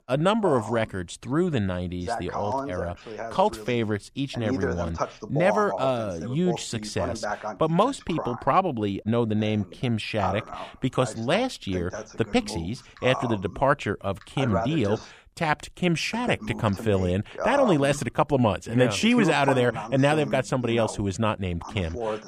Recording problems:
voice in the background; loud; throughout; 8 dB below the speech

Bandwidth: 15 kHz